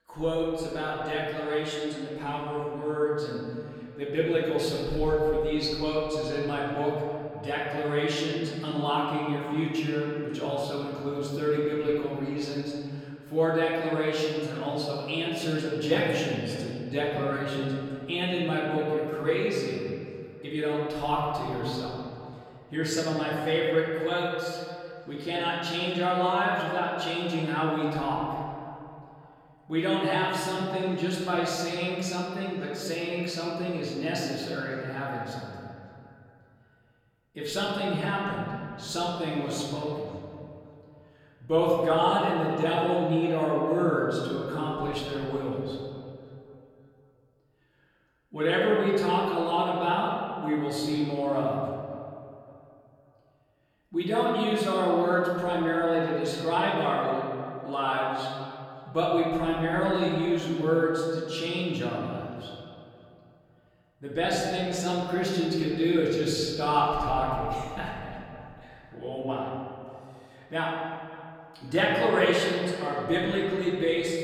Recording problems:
off-mic speech; far
room echo; noticeable; dies away in 2 s
echo of what is said; faint; throughout; 560 ms later, 20 dB below the speech

